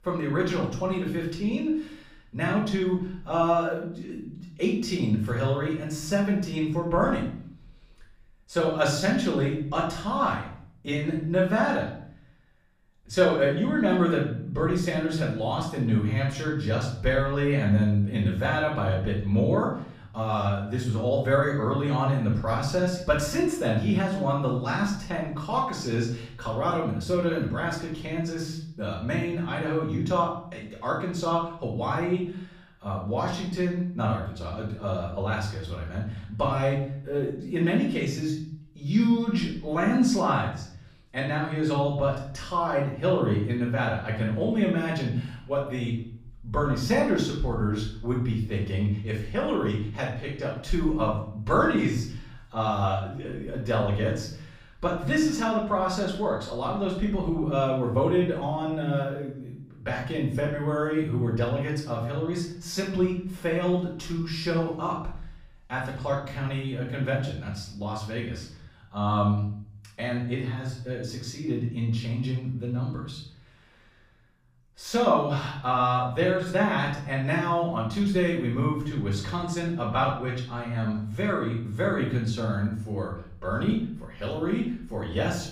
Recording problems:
off-mic speech; far
room echo; noticeable; dies away in 0.6 s

